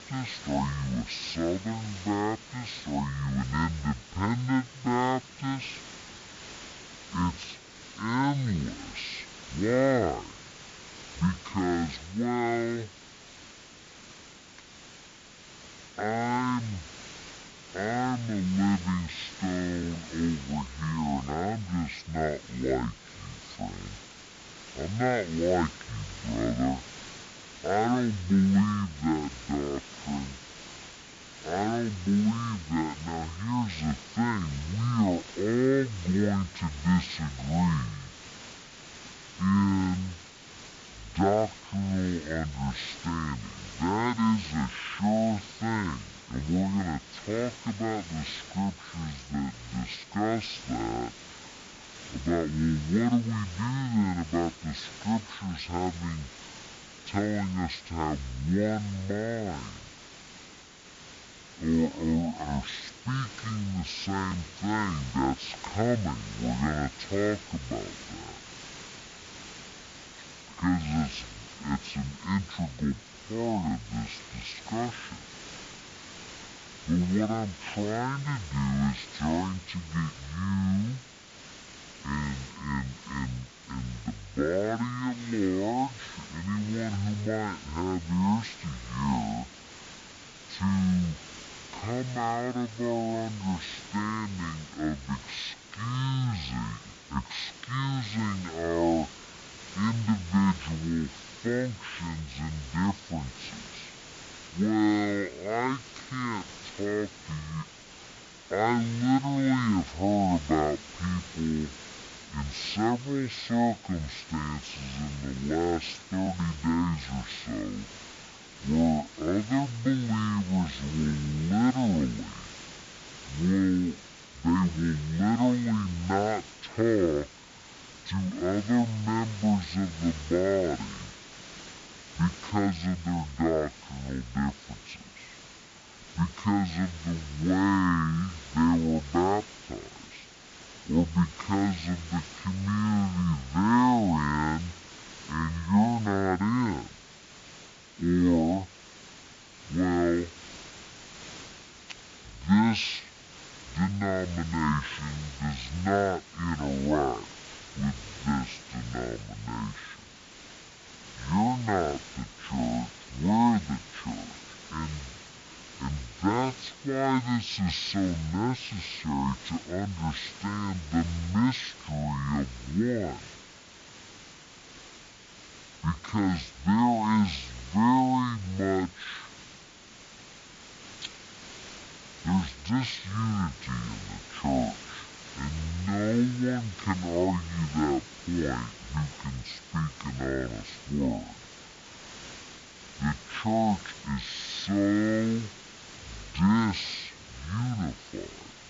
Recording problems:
wrong speed and pitch; too slow and too low; 0.5 times normal speed
hiss; noticeable; throughout; 15 dB below the speech
uneven, jittery; strongly; from 1:13 to 3:03

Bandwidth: 7.5 kHz